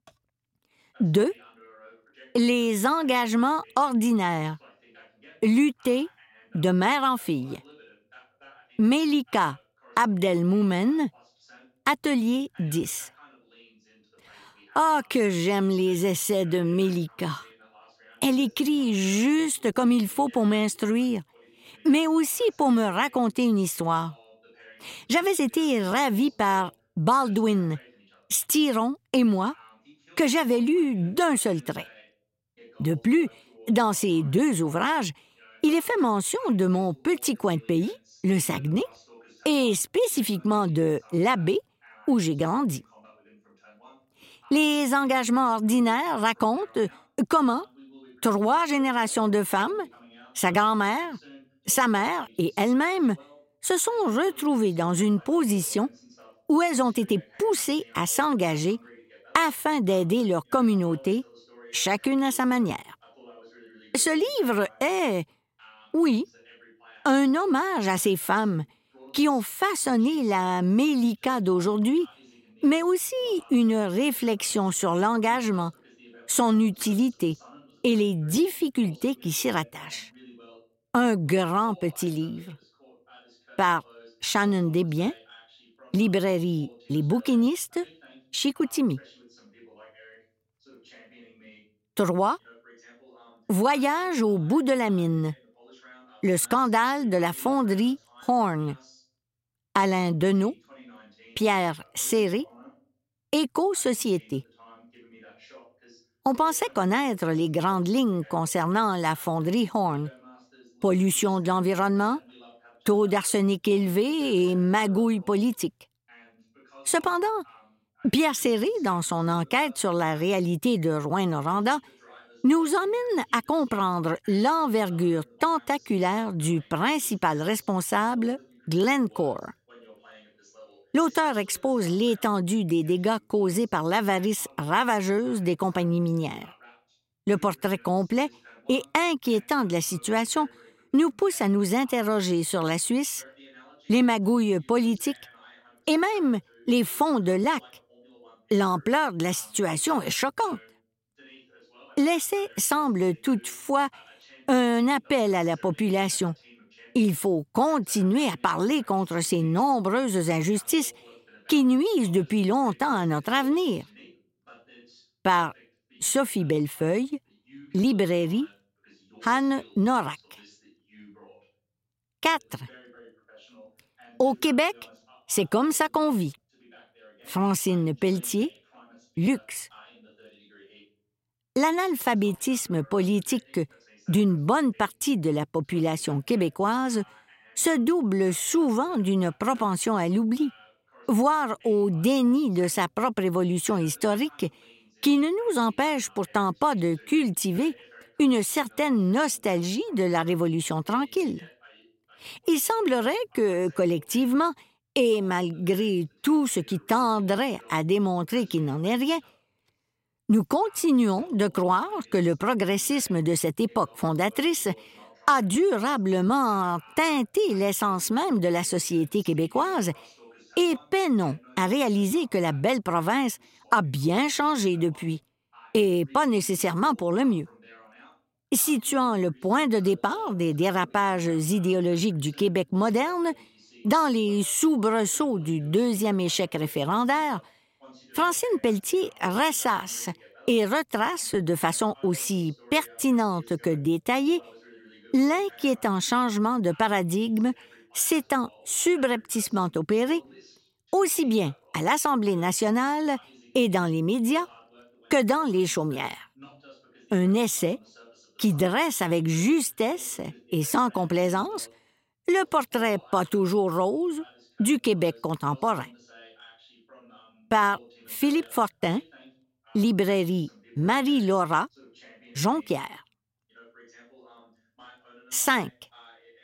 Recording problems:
voice in the background; faint; throughout; 30 dB below the speech

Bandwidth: 16 kHz